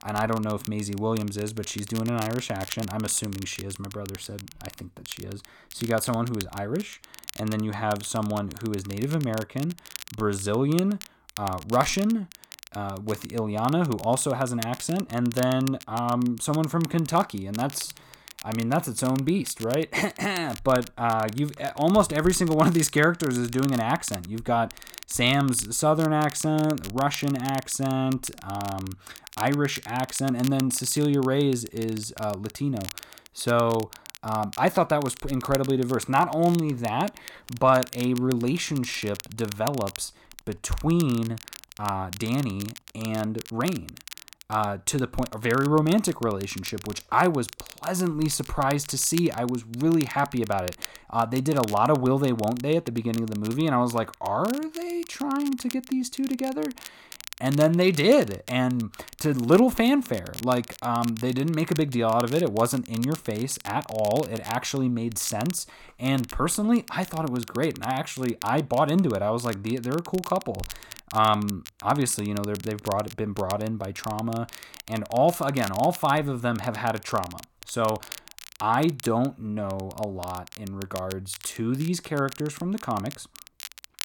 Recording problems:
crackle, like an old record; noticeable; 15 dB below the speech

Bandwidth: 17.5 kHz